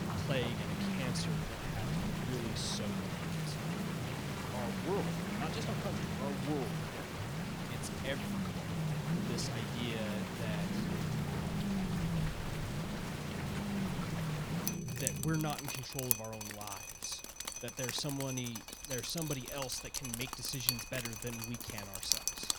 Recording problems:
rain or running water; very loud; throughout; 1 dB above the speech
low rumble; loud; until 15 s; 6 dB below the speech

